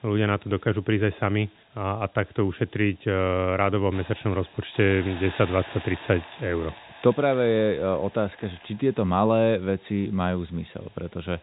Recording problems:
high frequencies cut off; severe; nothing above 4 kHz
hiss; noticeable; throughout; 15 dB below the speech

